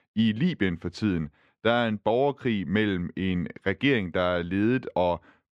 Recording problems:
muffled; slightly; fading above 3 kHz

